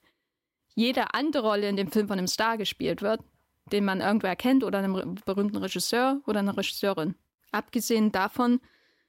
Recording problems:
none

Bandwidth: 16 kHz